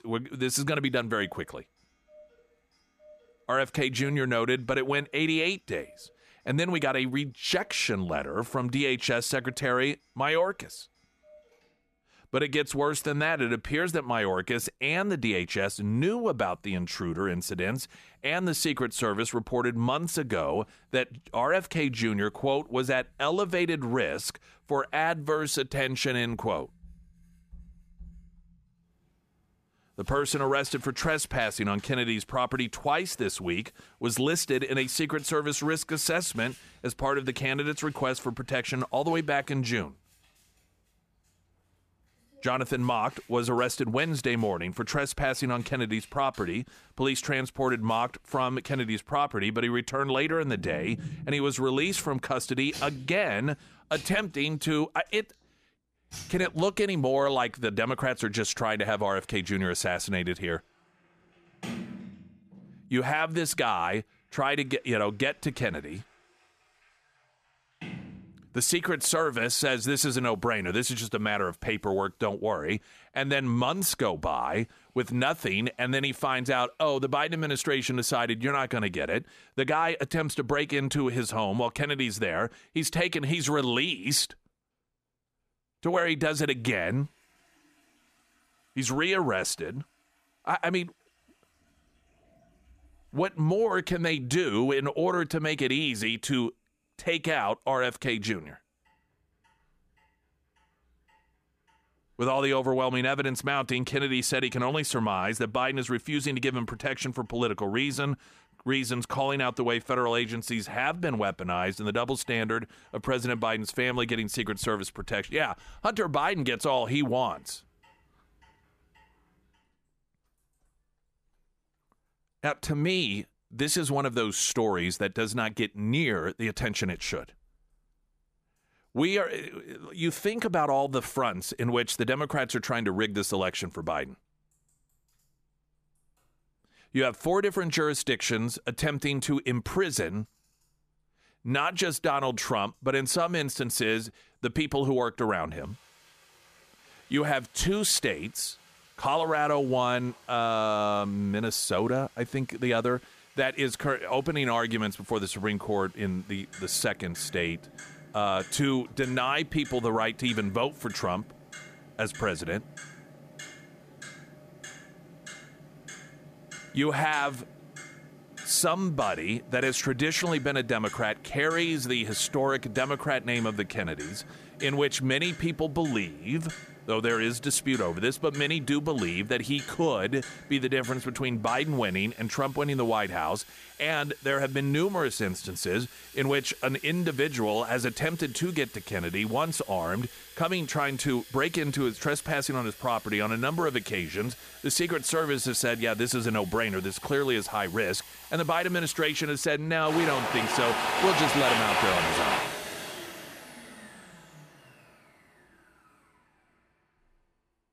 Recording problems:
household noises; noticeable; throughout; 10 dB below the speech

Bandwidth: 14.5 kHz